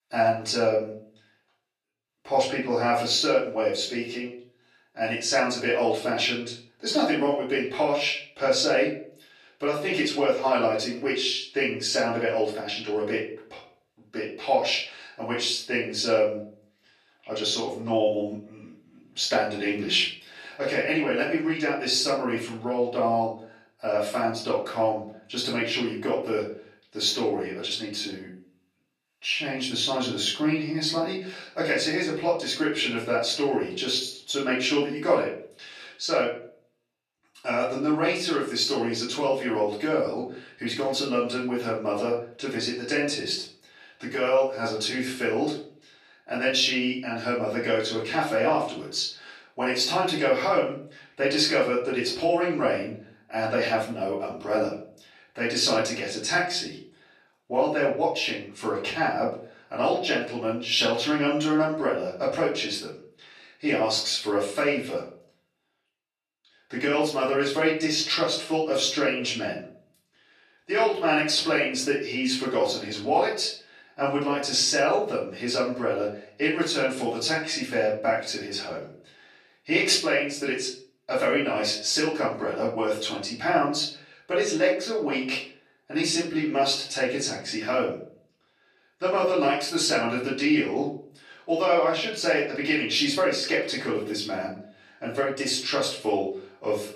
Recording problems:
off-mic speech; far
room echo; noticeable; dies away in 0.4 s
thin; somewhat; fading below 350 Hz

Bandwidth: 14.5 kHz